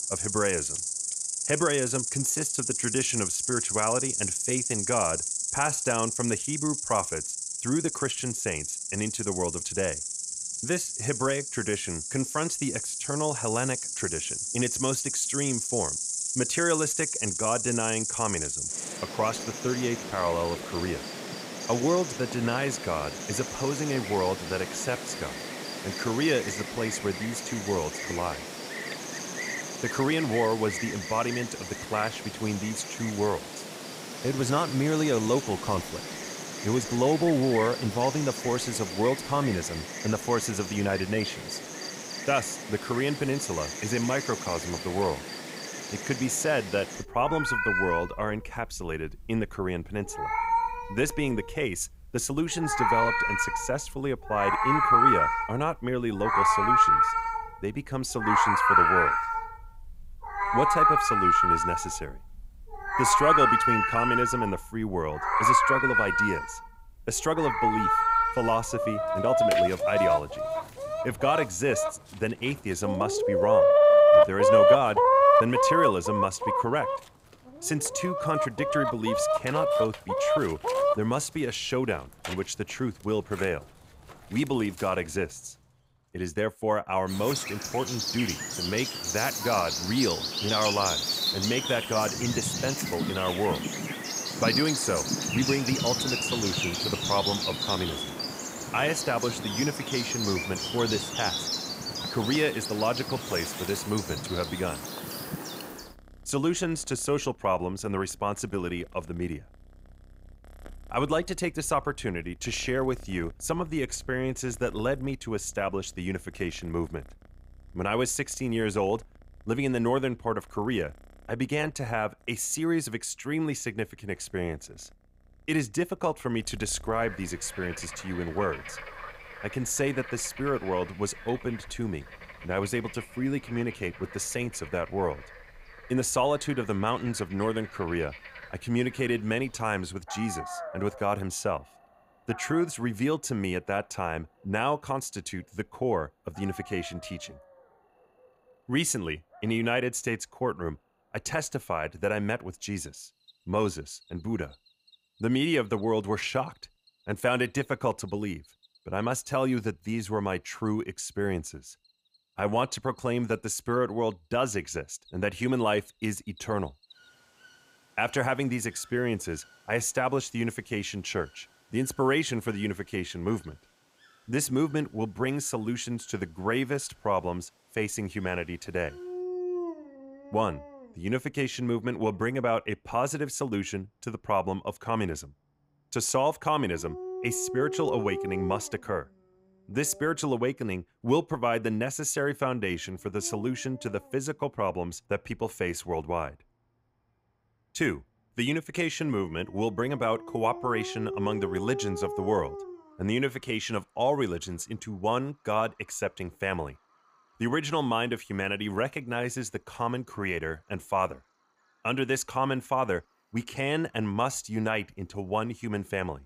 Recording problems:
animal sounds; very loud; throughout; 2 dB above the speech

